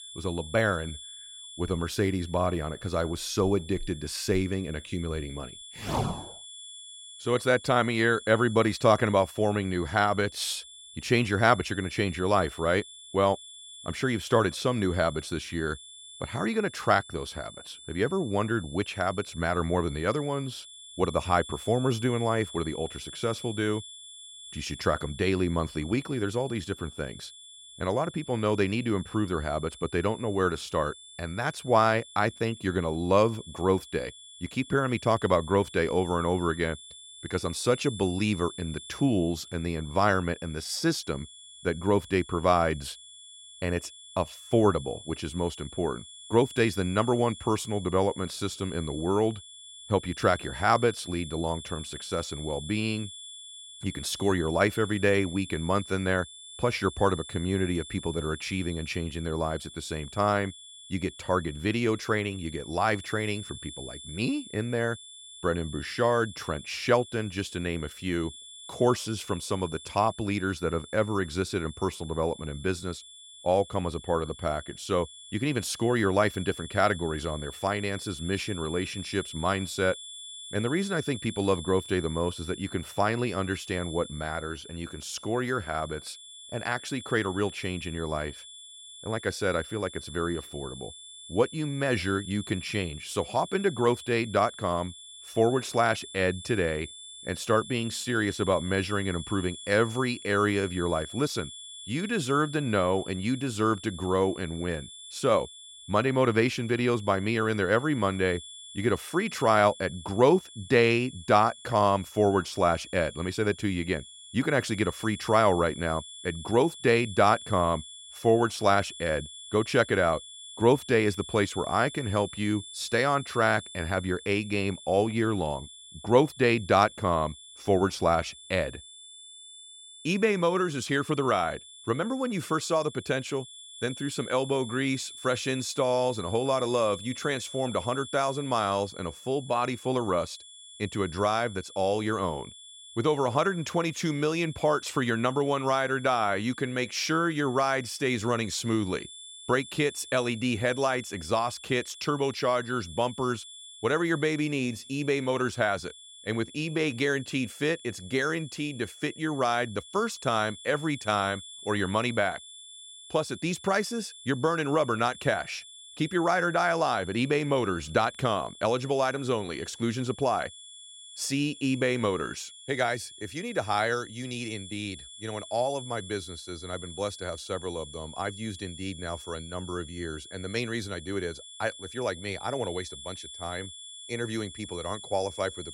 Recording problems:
high-pitched whine; noticeable; throughout; 3.5 kHz, 15 dB below the speech

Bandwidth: 16 kHz